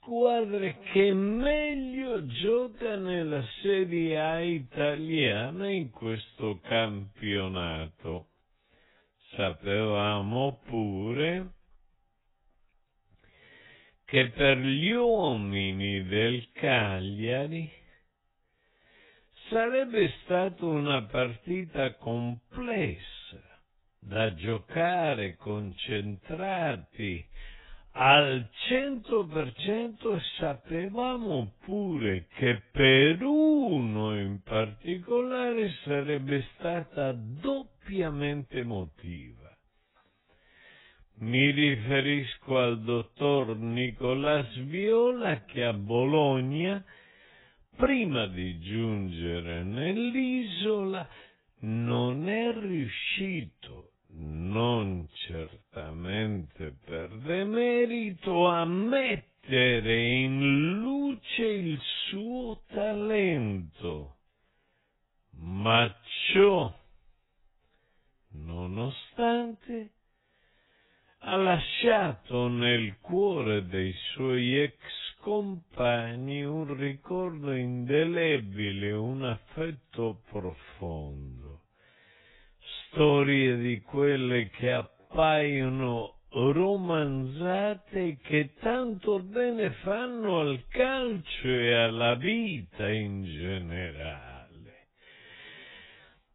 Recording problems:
garbled, watery; badly; nothing above 3.5 kHz
wrong speed, natural pitch; too slow; 0.5 times normal speed
uneven, jittery; strongly; from 7.5 s to 1:27

